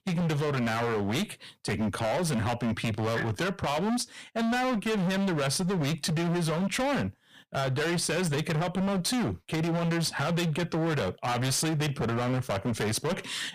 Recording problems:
distortion; heavy; 35% of the sound clipped

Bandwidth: 15 kHz